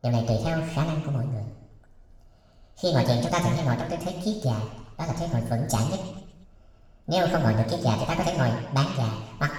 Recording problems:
wrong speed and pitch; too fast and too high; 1.5 times normal speed
room echo; noticeable; dies away in 1 s
off-mic speech; somewhat distant

